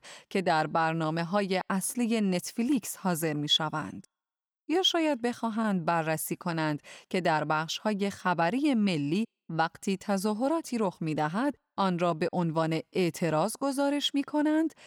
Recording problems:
none

